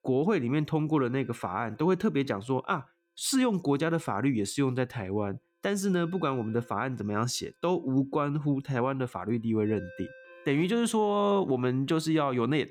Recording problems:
alarms or sirens; faint; throughout; 25 dB below the speech

